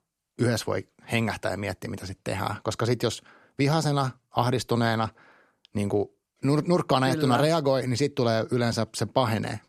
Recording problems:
none

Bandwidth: 13.5 kHz